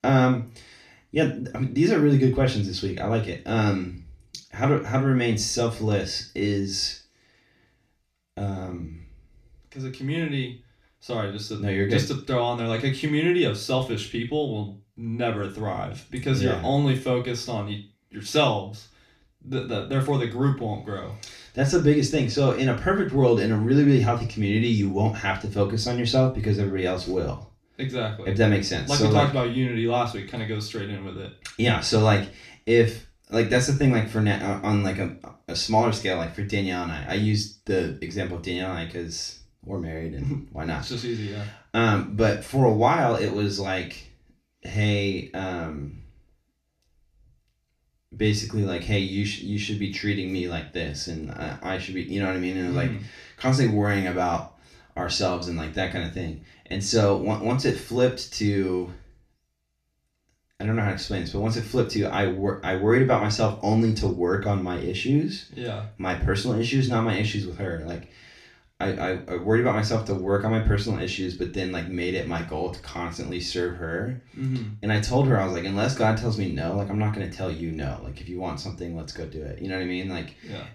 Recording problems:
off-mic speech; far
room echo; slight; dies away in 0.3 s

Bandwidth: 14.5 kHz